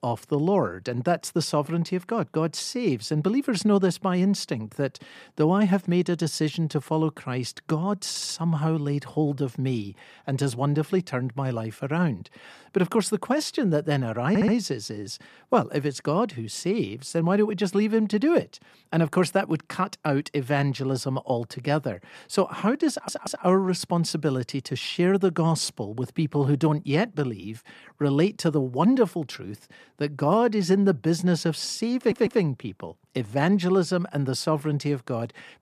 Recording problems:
audio stuttering; 4 times, first at 8 s

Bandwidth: 14.5 kHz